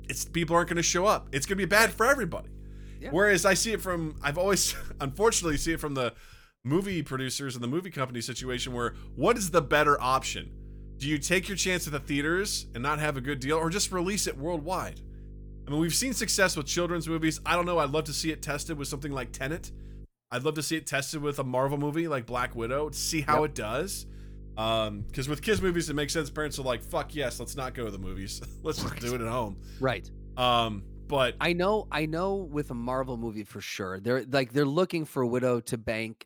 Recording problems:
electrical hum; faint; until 6 s, from 8.5 to 20 s and from 22 to 33 s; 50 Hz, 30 dB below the speech

